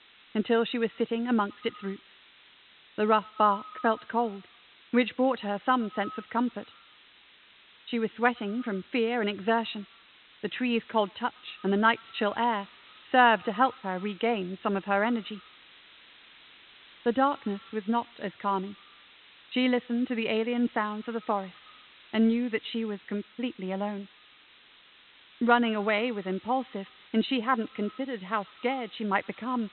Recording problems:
high frequencies cut off; severe; nothing above 4 kHz
echo of what is said; faint; throughout; 110 ms later, 25 dB below the speech
hiss; faint; throughout; 25 dB below the speech

